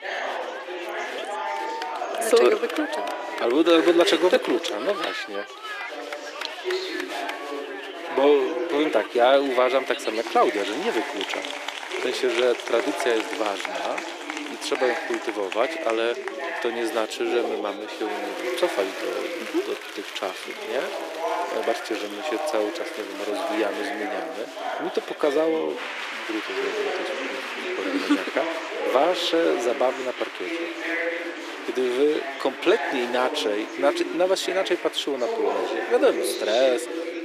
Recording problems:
thin; very; fading below 350 Hz
chatter from many people; loud; throughout; 5 dB below the speech

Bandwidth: 14.5 kHz